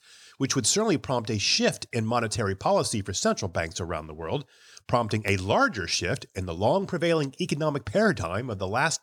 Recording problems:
none

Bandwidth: 18.5 kHz